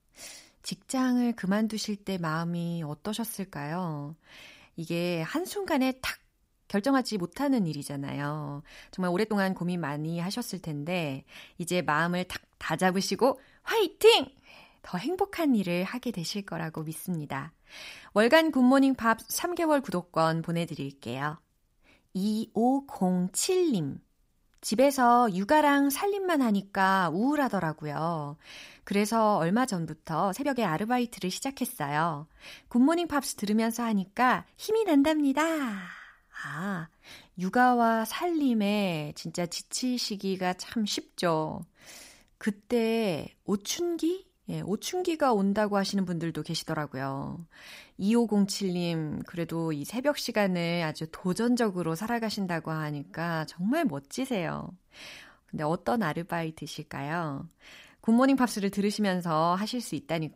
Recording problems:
uneven, jittery; strongly; from 6.5 to 59 s

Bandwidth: 15.5 kHz